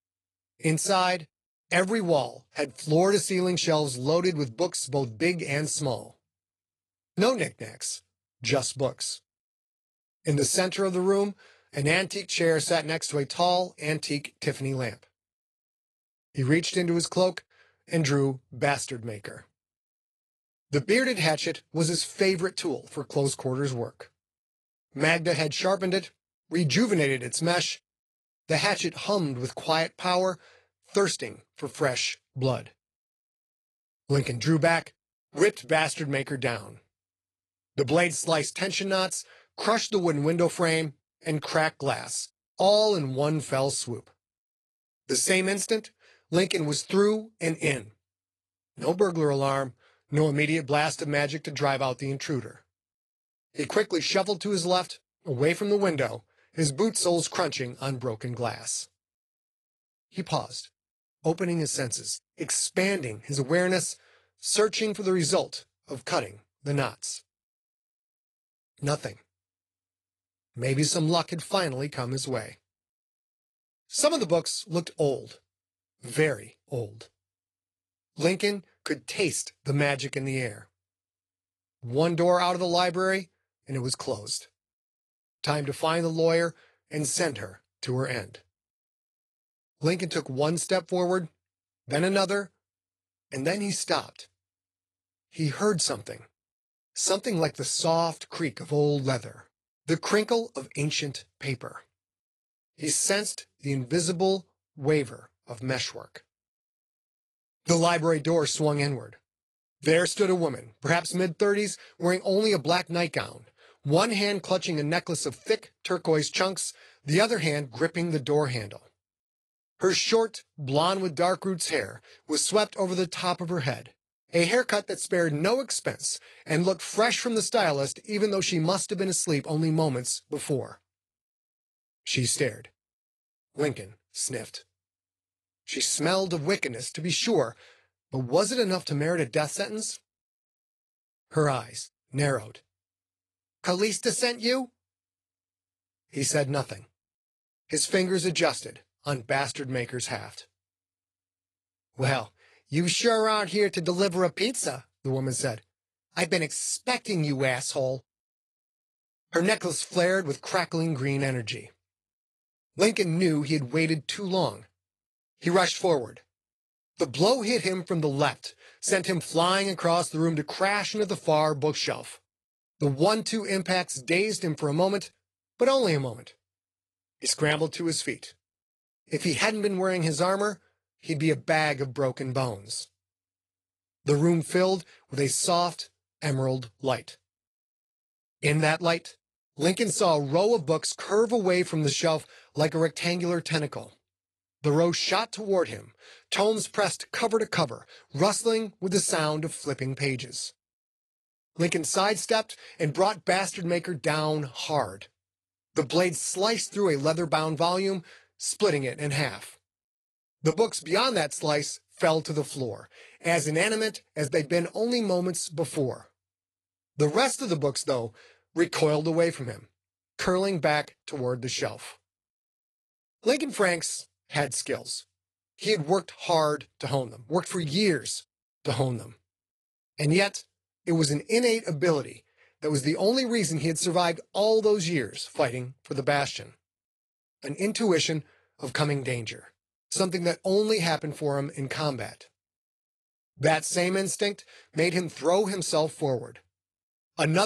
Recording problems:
garbled, watery; slightly
abrupt cut into speech; at the end

